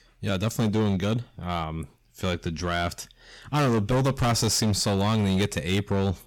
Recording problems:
distortion; heavy; 14% of the sound clipped

